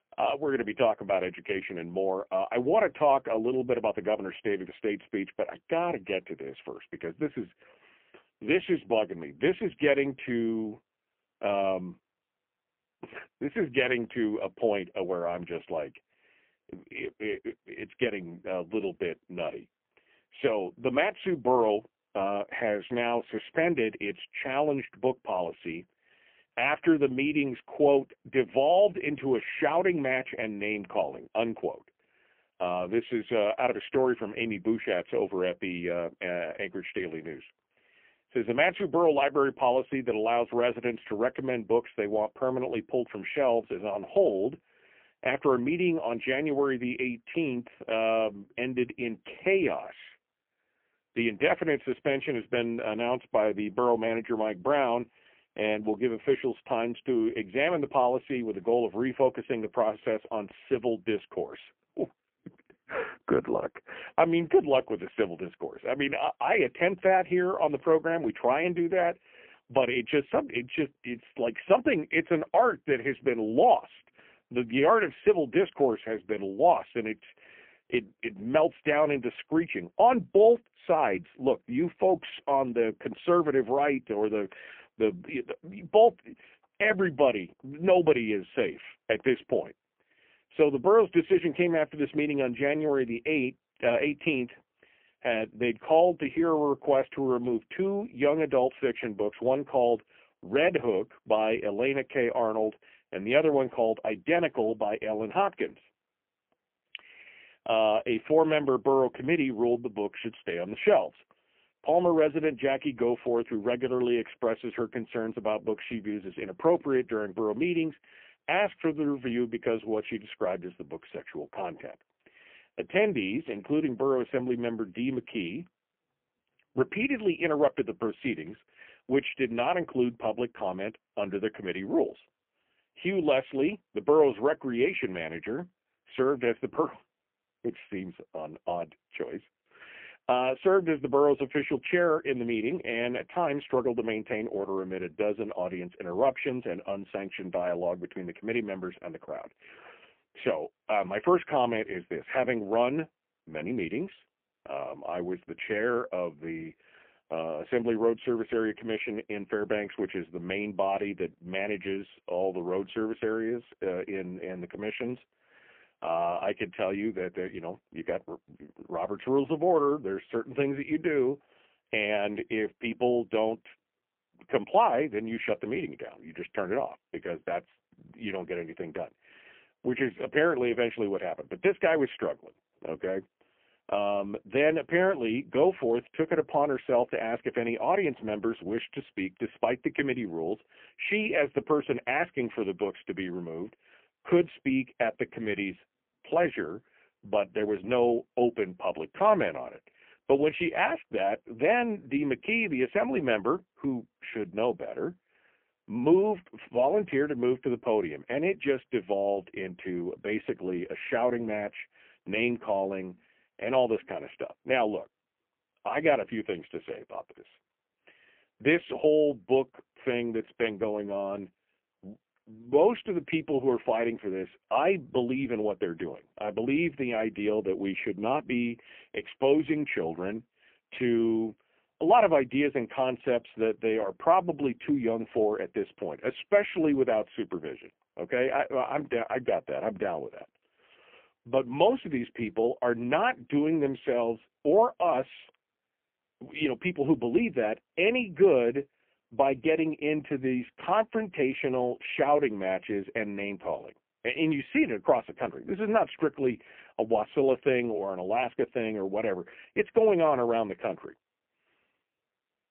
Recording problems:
phone-call audio; poor line; nothing above 3 kHz

